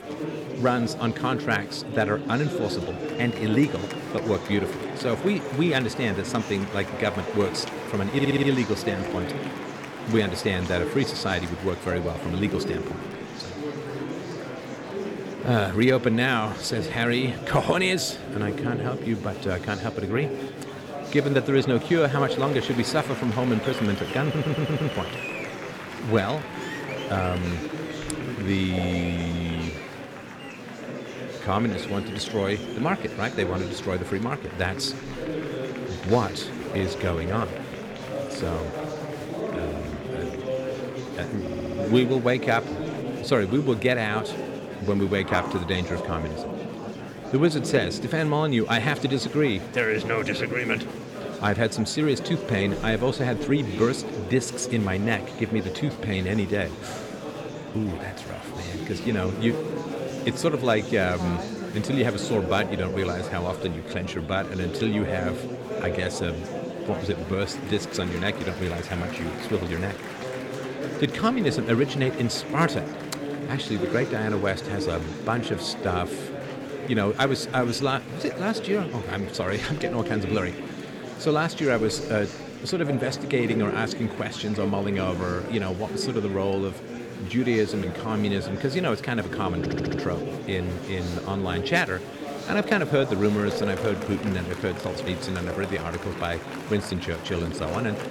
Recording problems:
murmuring crowd; loud; throughout; 6 dB below the speech
audio stuttering; 4 times, first at 8 s
phone ringing; noticeable; from 45 to 47 s; peak 5 dB below the speech

